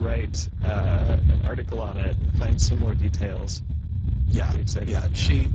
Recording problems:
garbled, watery; badly
low rumble; loud; throughout; 8 dB below the speech
abrupt cut into speech; at the start

